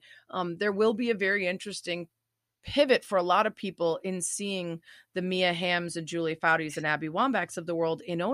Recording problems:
abrupt cut into speech; at the end

